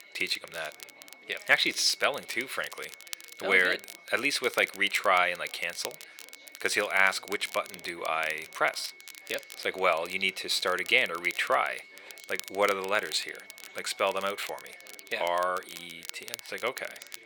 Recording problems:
thin; very; fading below 550 Hz
crackle, like an old record; noticeable; 15 dB below the speech
high-pitched whine; faint; throughout; 2 kHz, 25 dB below the speech
chatter from many people; faint; throughout; 25 dB below the speech

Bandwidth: 18.5 kHz